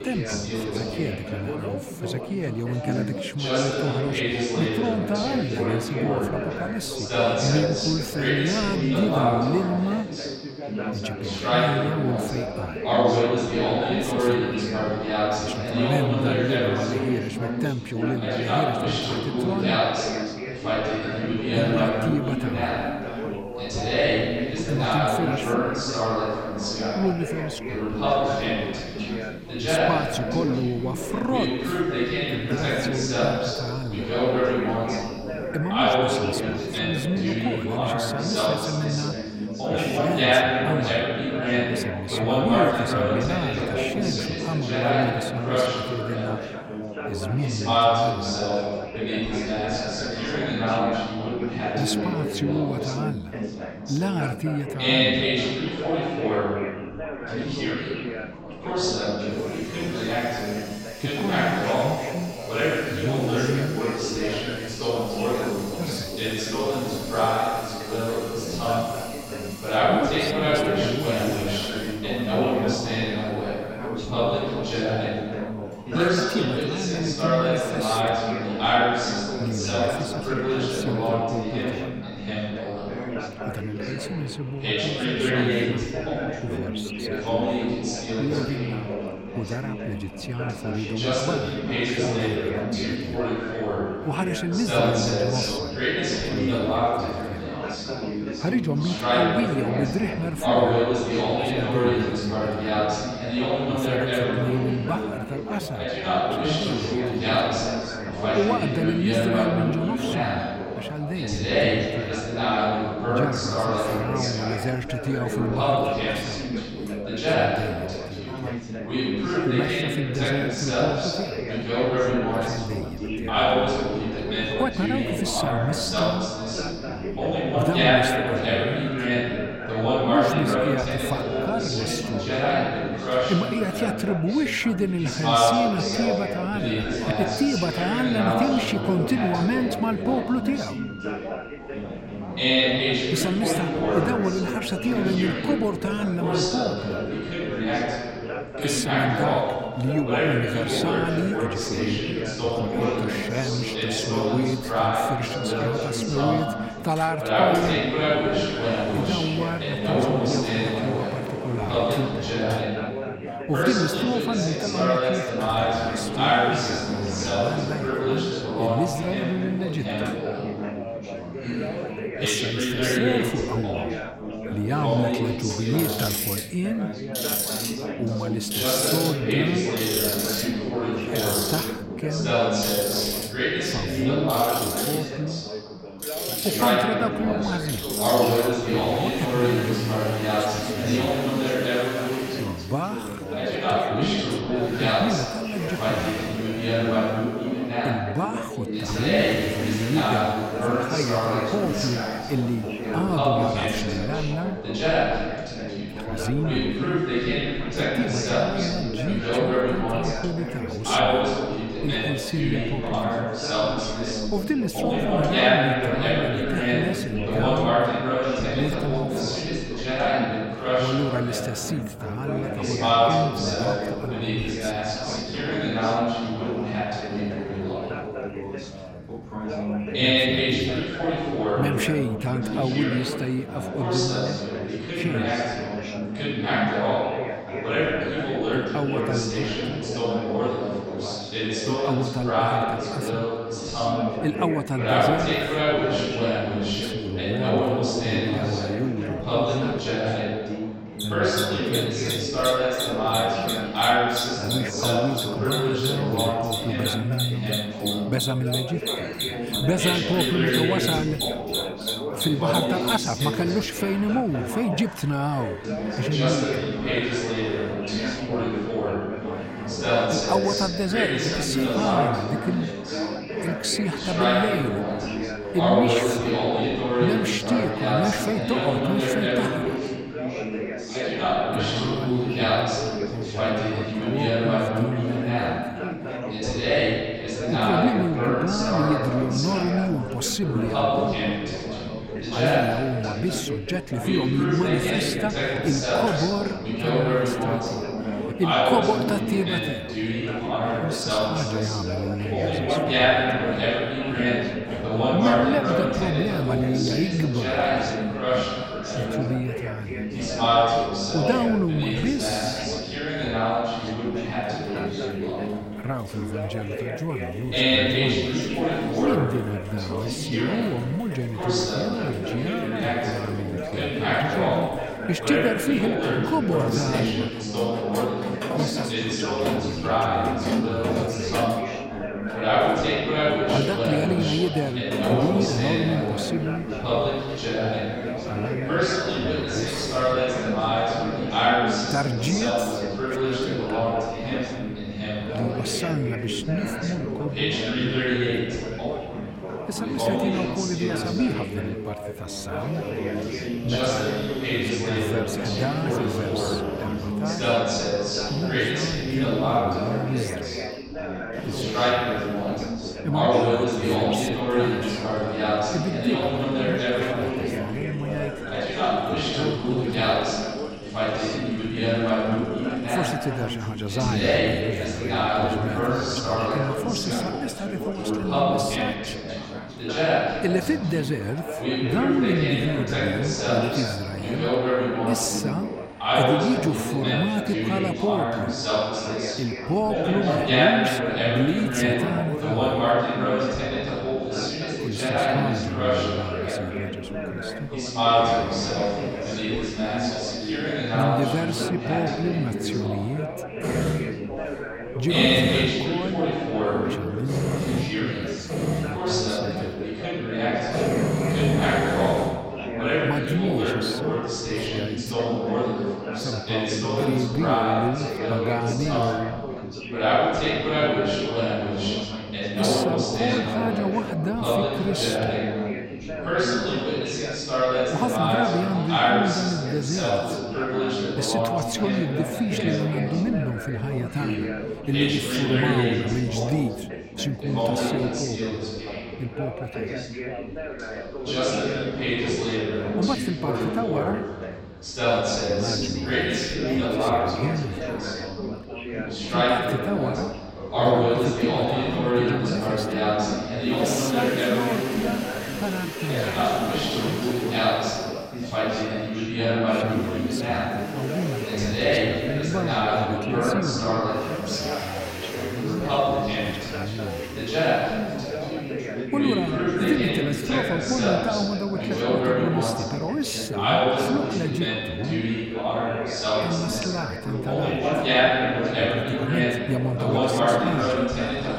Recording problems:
chatter from many people; very loud; throughout; 3 dB above the speech
machinery noise; loud; throughout; 8 dB below the speech

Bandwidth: 16 kHz